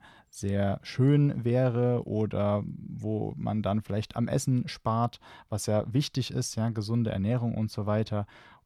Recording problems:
none

